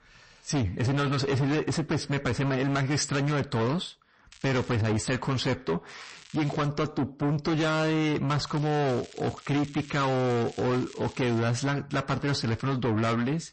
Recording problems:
distortion; heavy; 7 dB below the speech
garbled, watery; slightly; nothing above 8 kHz
crackling; faint; at 4.5 s, at 6 s and from 8.5 to 11 s; 20 dB below the speech

